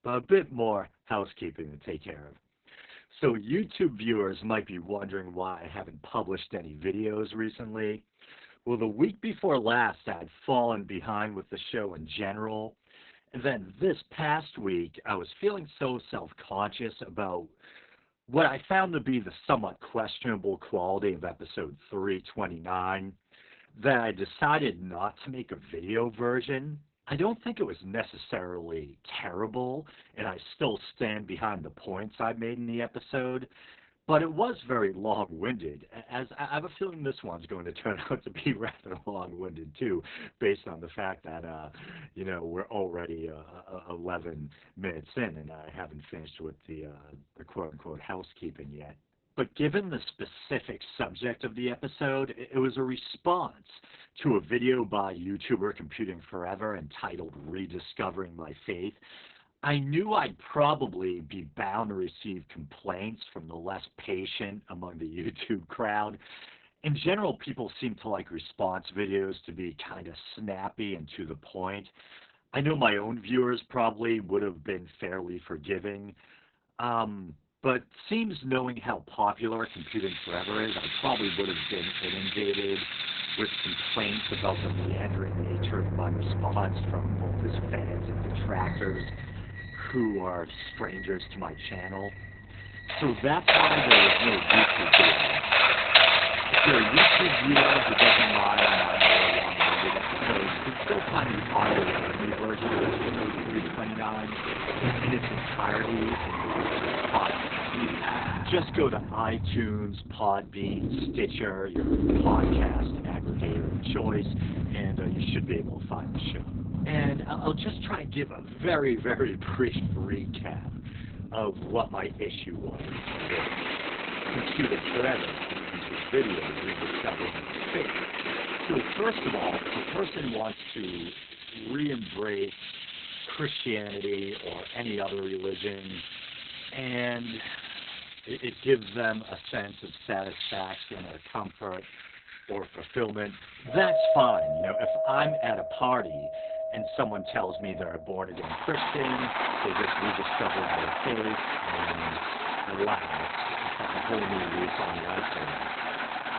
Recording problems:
garbled, watery; badly; nothing above 4 kHz
household noises; very loud; from 1:20 on; 4 dB above the speech

